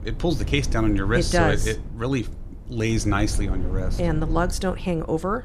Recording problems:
wind noise on the microphone; occasional gusts; 15 dB below the speech

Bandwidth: 14.5 kHz